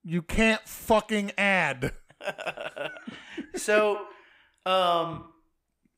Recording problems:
echo of what is said; strong; from 4 s on; 90 ms later, 10 dB below the speech

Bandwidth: 15.5 kHz